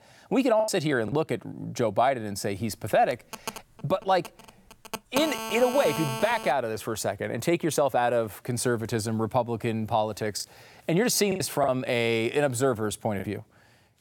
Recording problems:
choppy; occasionally; 3% of the speech affected
phone ringing; noticeable; from 3 to 6.5 s; peak 4 dB below the speech

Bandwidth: 17.5 kHz